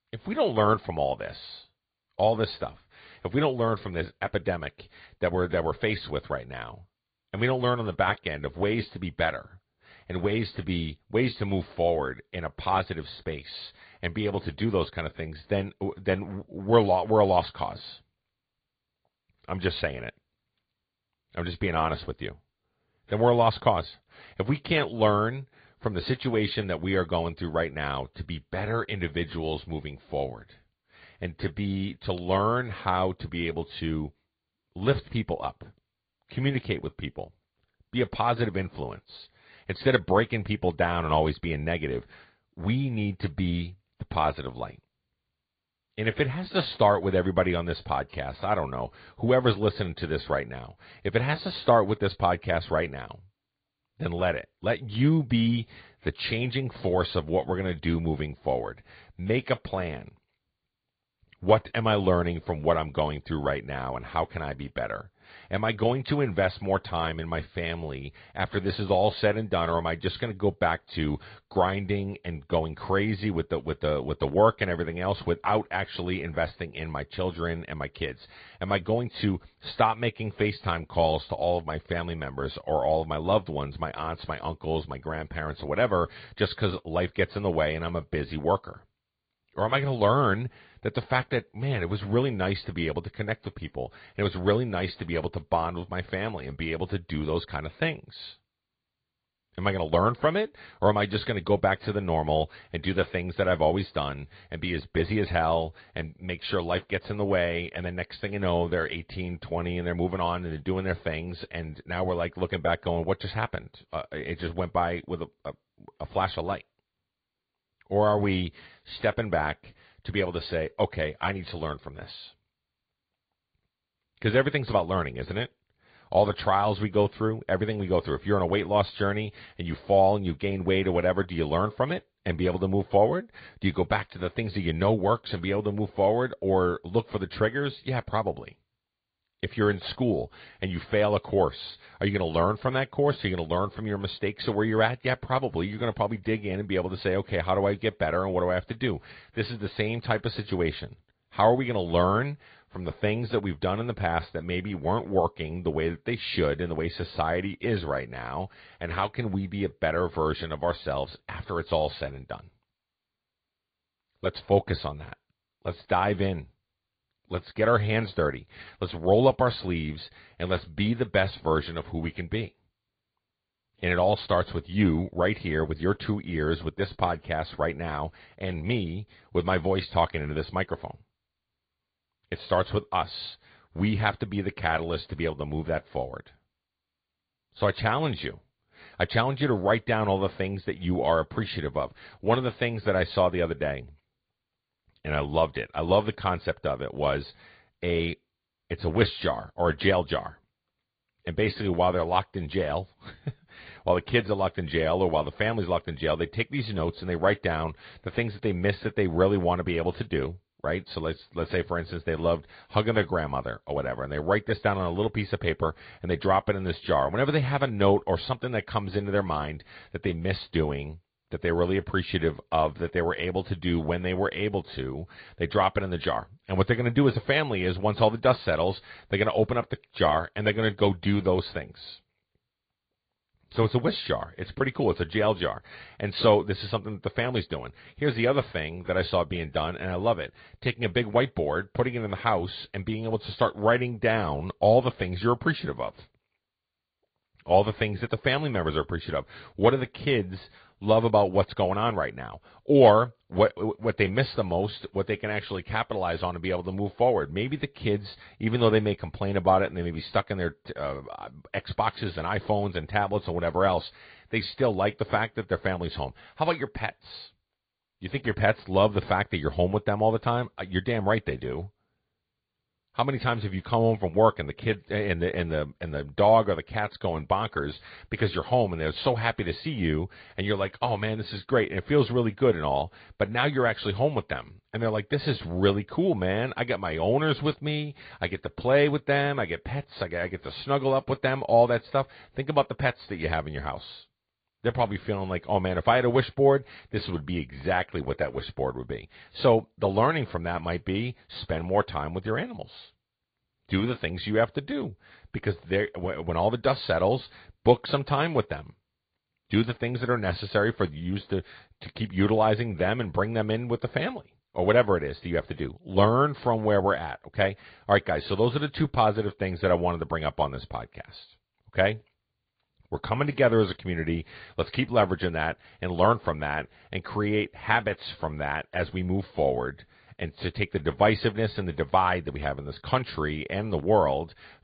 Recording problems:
high frequencies cut off; severe; nothing above 4.5 kHz
garbled, watery; slightly

